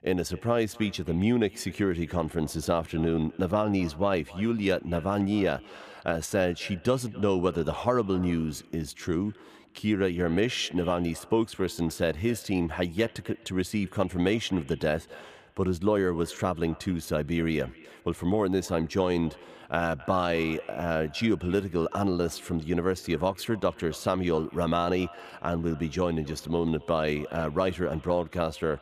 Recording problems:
echo of what is said; faint; throughout; 260 ms later, 20 dB below the speech

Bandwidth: 14.5 kHz